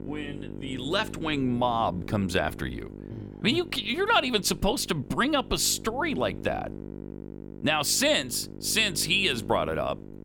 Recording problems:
electrical hum; noticeable; throughout; 50 Hz, 20 dB below the speech

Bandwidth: 18 kHz